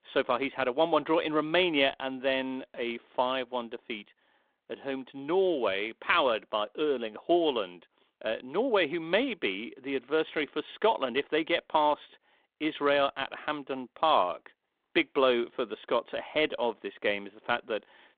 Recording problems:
phone-call audio

